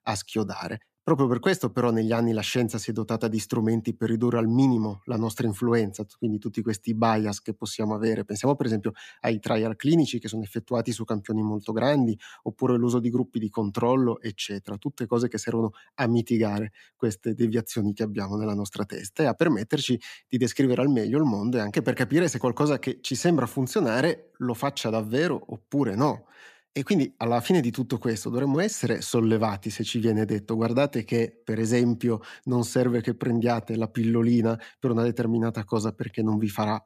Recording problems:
none

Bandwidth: 14.5 kHz